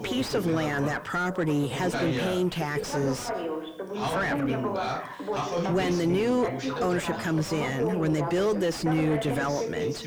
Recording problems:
distortion; heavy; 7 dB below the speech
background chatter; loud; throughout; 2 voices, 4 dB below the speech

